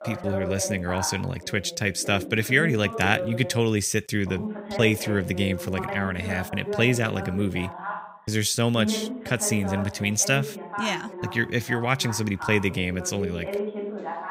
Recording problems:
voice in the background; loud; throughout; 9 dB below the speech

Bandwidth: 15.5 kHz